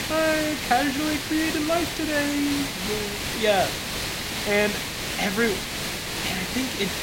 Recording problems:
hiss; loud; throughout; 2 dB below the speech

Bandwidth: 16 kHz